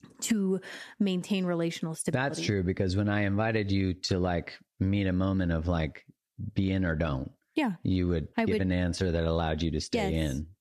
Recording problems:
squashed, flat; somewhat

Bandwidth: 14.5 kHz